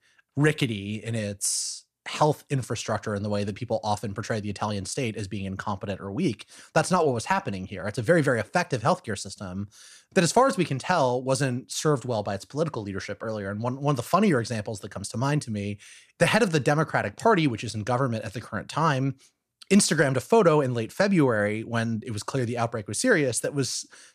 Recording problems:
none

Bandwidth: 14.5 kHz